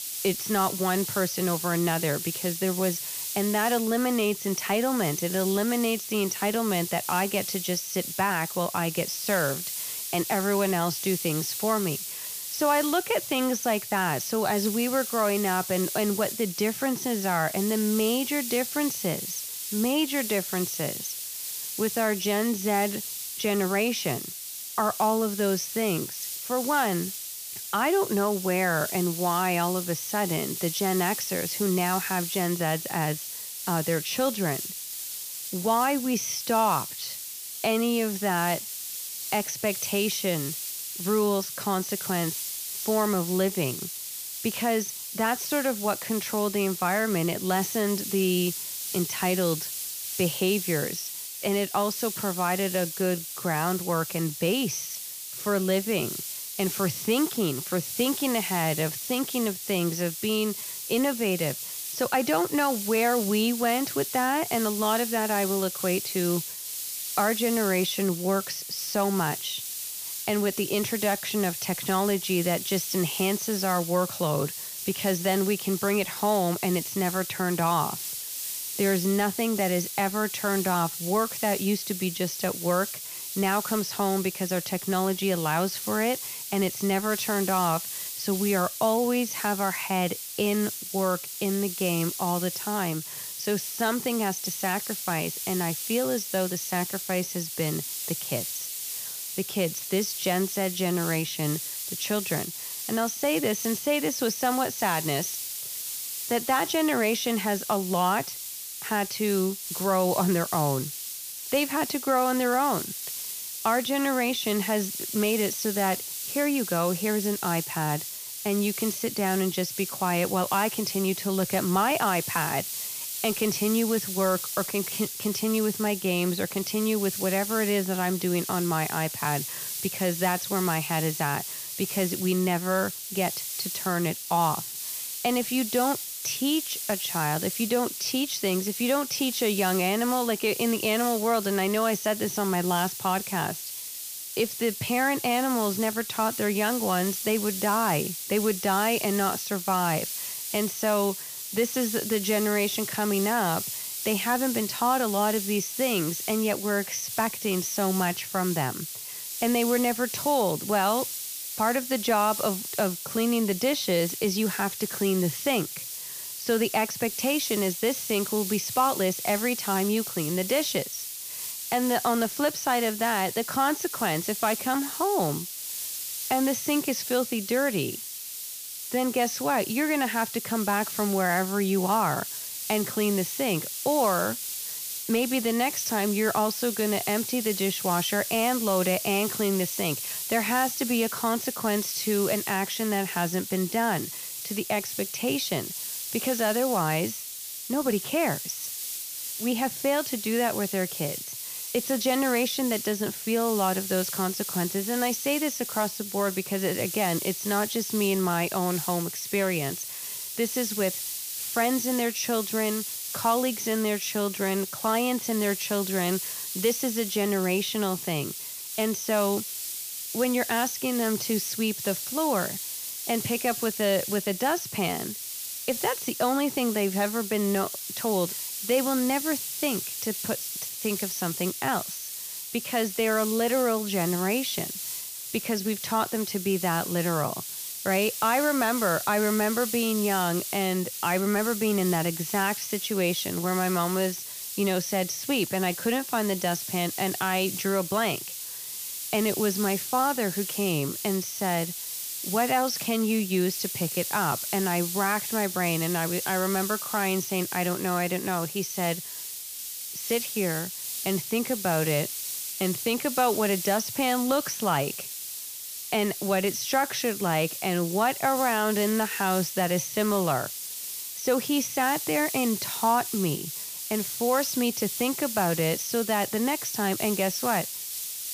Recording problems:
high frequencies cut off; noticeable; nothing above 6.5 kHz
hiss; loud; throughout; 5 dB below the speech

